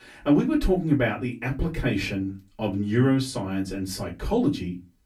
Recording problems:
off-mic speech; far
room echo; very slight; dies away in 0.2 s

